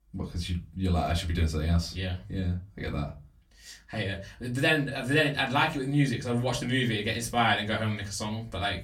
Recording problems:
off-mic speech; far
room echo; very slight; dies away in 0.2 s

